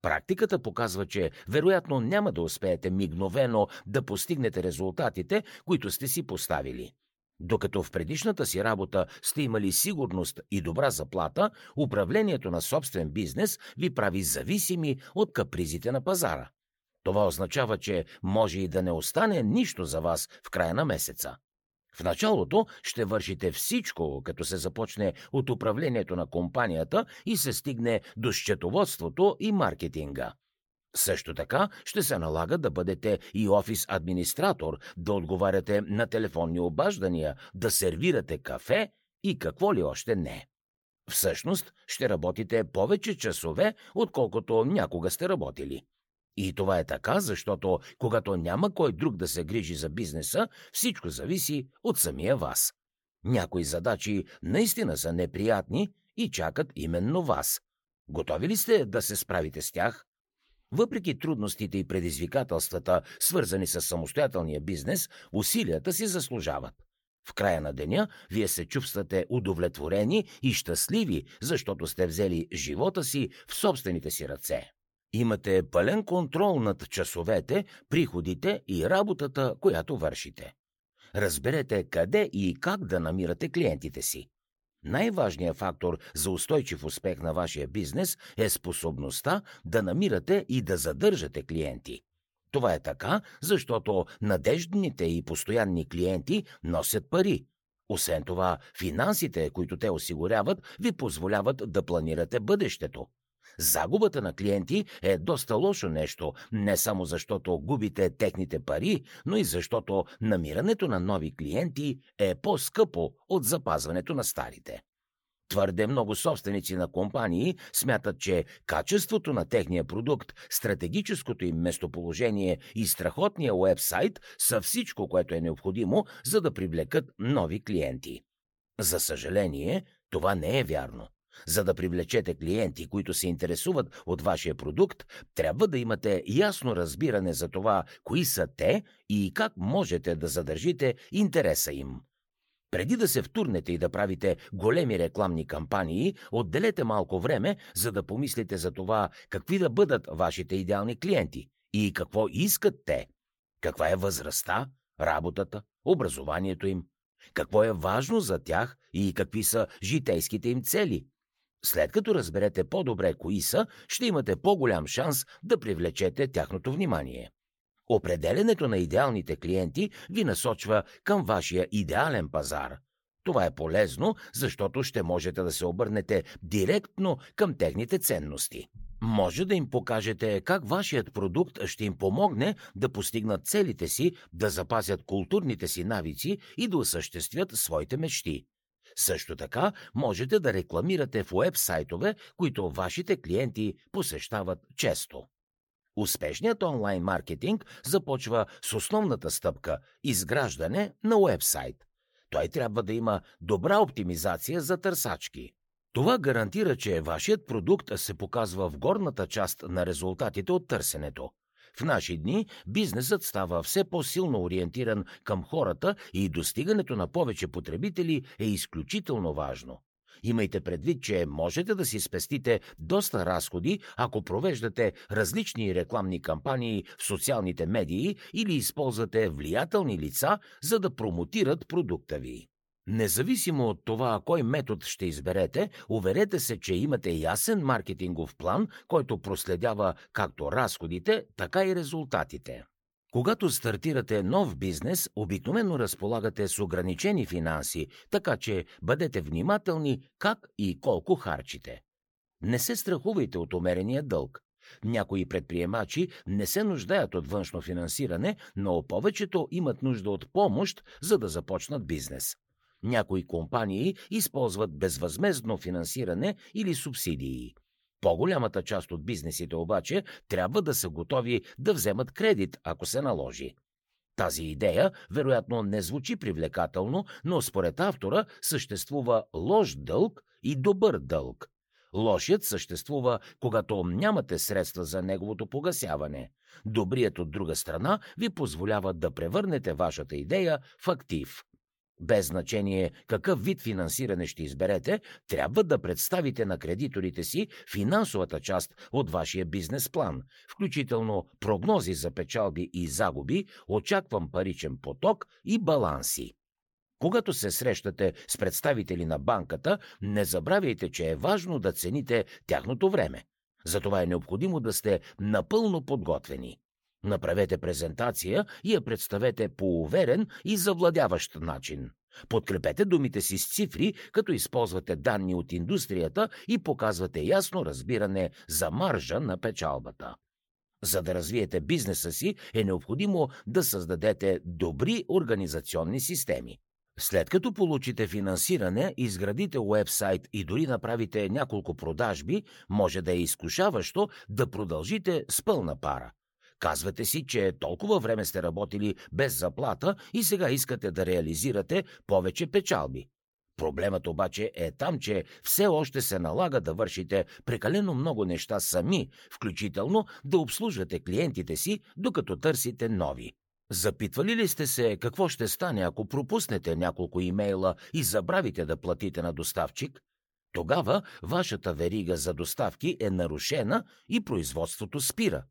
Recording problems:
none

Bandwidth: 18.5 kHz